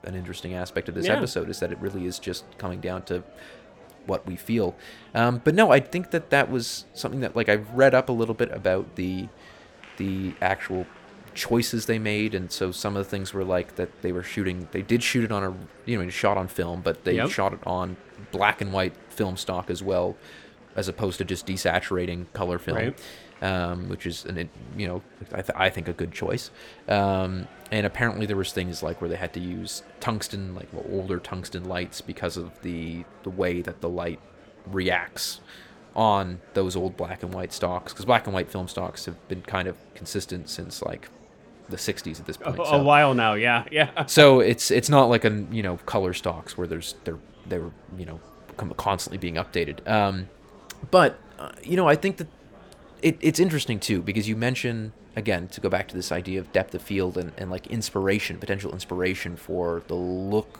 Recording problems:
murmuring crowd; faint; throughout; 25 dB below the speech

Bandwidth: 18 kHz